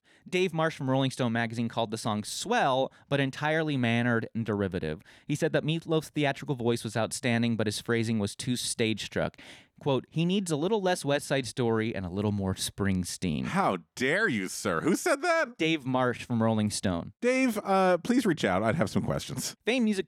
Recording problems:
none

